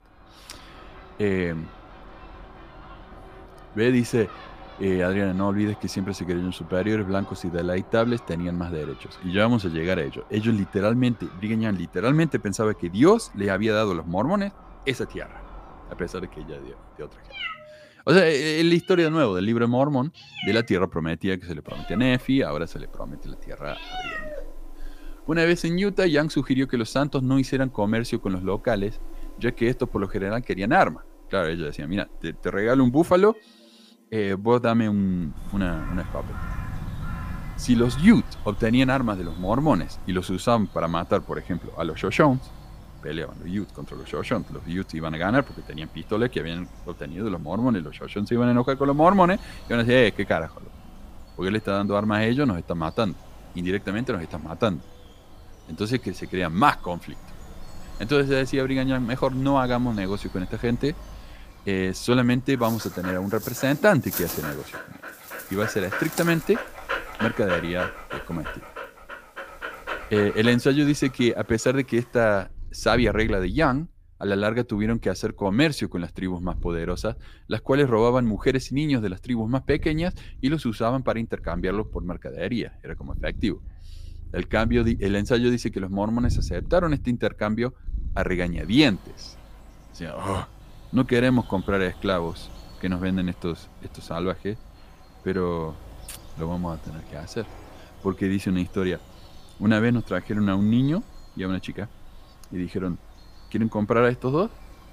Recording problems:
animal sounds; noticeable; throughout; 15 dB below the speech

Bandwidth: 15 kHz